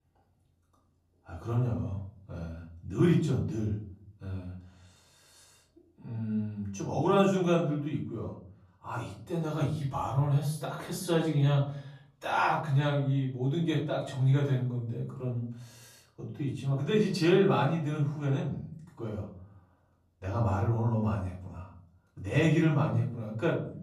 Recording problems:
off-mic speech; far
room echo; noticeable; dies away in 0.6 s

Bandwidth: 13.5 kHz